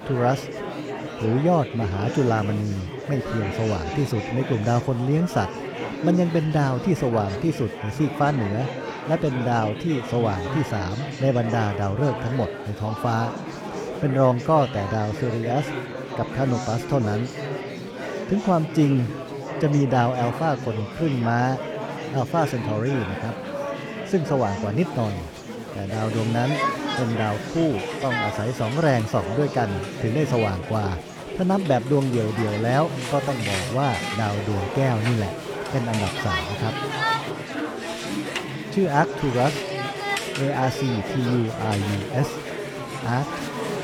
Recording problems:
murmuring crowd; loud; throughout; 6 dB below the speech

